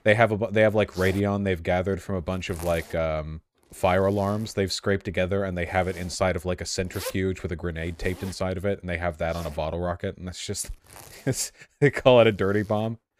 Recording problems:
household noises; noticeable; throughout; 20 dB below the speech

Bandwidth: 15 kHz